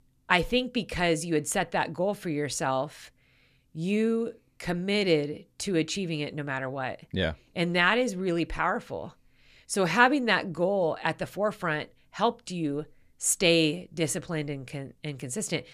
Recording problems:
none

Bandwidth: 14.5 kHz